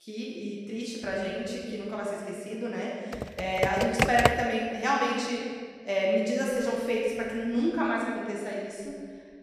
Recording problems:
room echo; strong; dies away in 1.8 s
off-mic speech; far
keyboard typing; loud; from 3 to 4.5 s; peak 5 dB above the speech

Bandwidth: 14 kHz